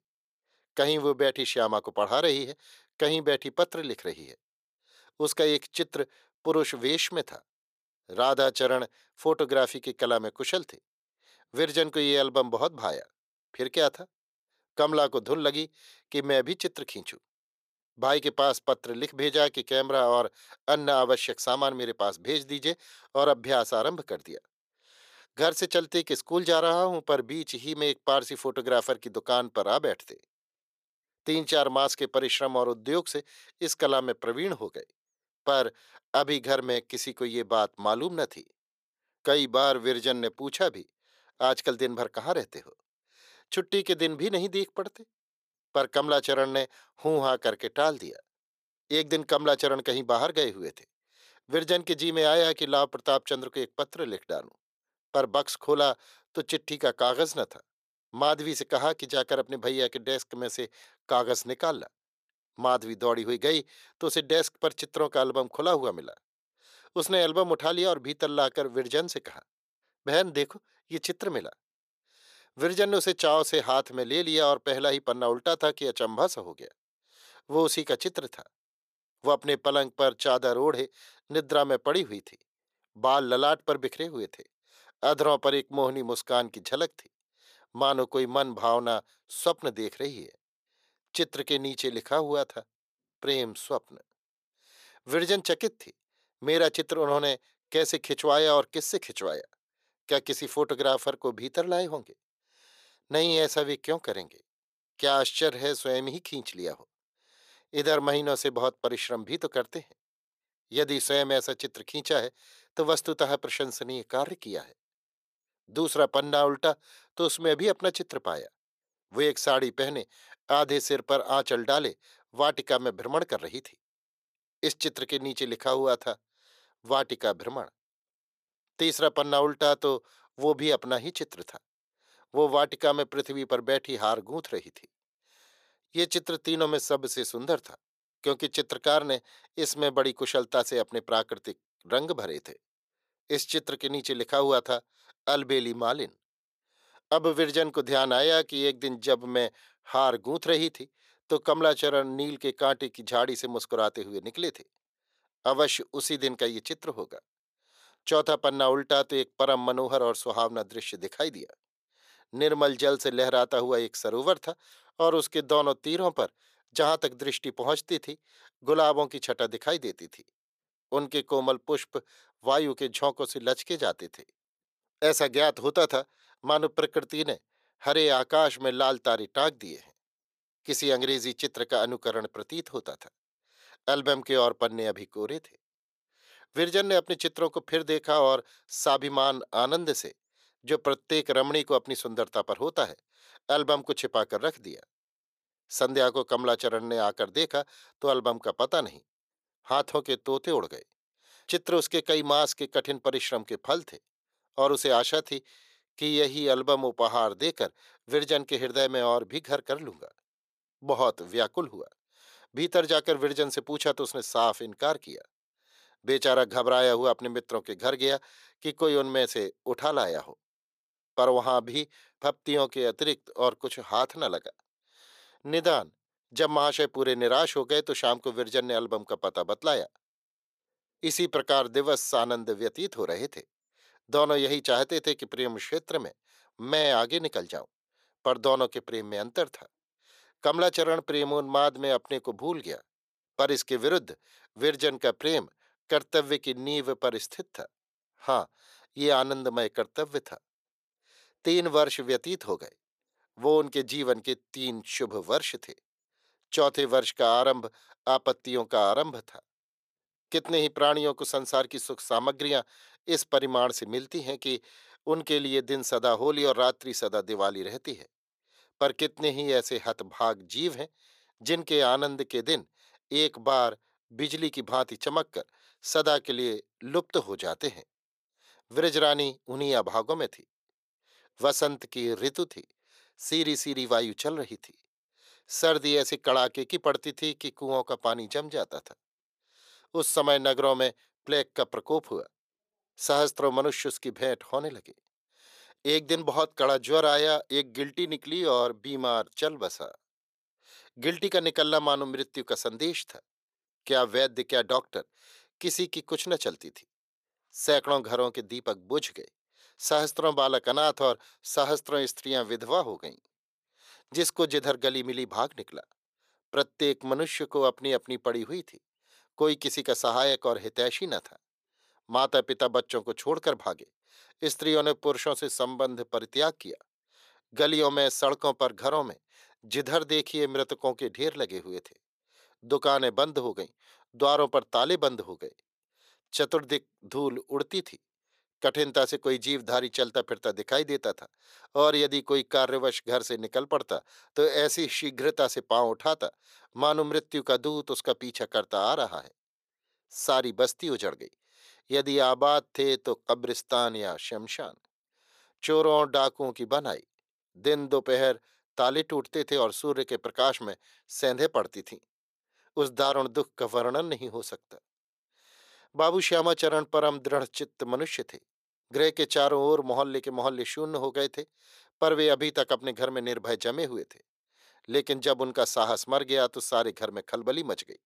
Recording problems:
thin; somewhat; fading below 450 Hz

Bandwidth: 14.5 kHz